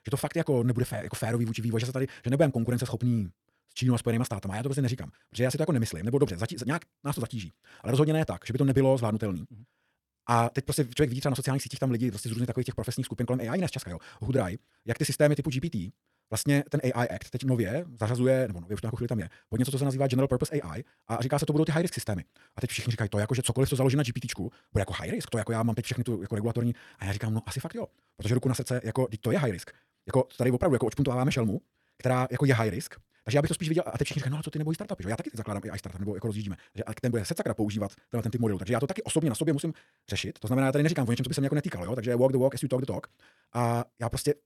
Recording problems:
wrong speed, natural pitch; too fast; 1.7 times normal speed

